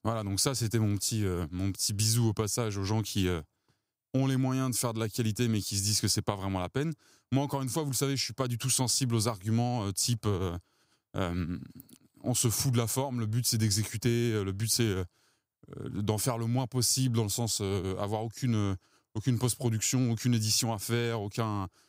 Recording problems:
none

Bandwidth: 15.5 kHz